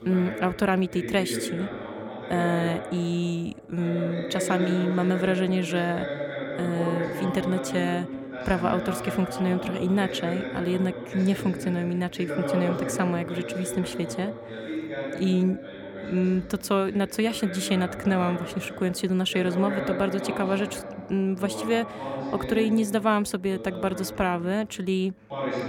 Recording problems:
voice in the background; loud; throughout; 7 dB below the speech

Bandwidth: 17 kHz